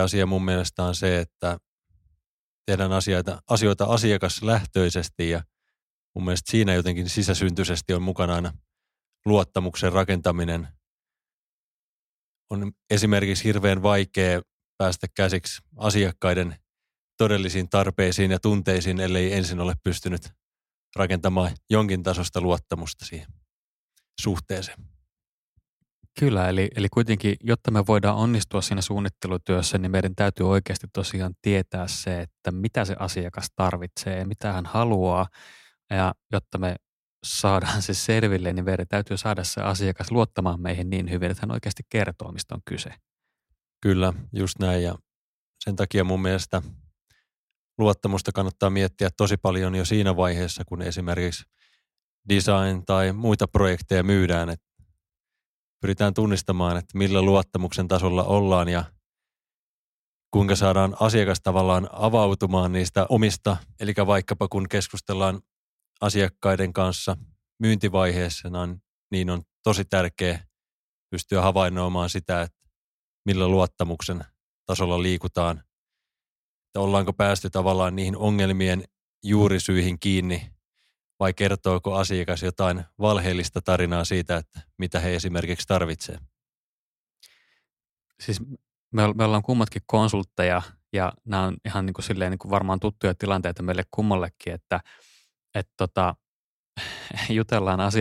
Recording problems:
abrupt cut into speech; at the start and the end

